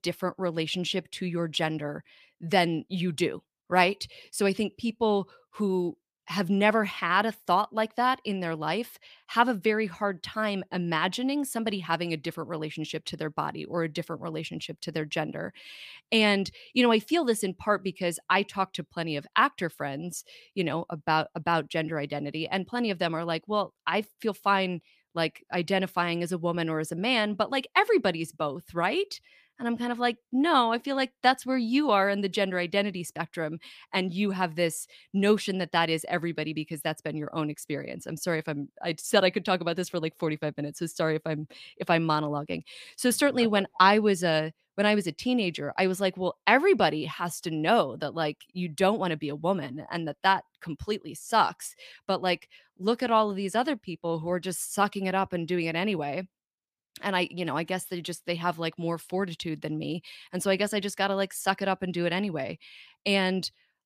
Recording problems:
none

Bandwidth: 15 kHz